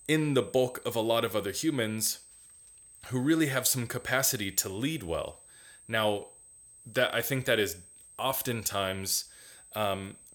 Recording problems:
high-pitched whine; faint; throughout; 8 kHz, 20 dB below the speech

